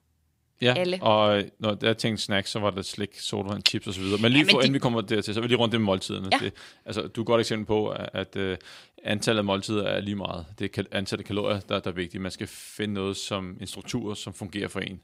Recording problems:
none

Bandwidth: 15.5 kHz